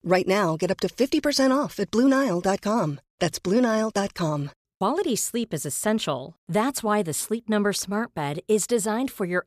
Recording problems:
none

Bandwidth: 14.5 kHz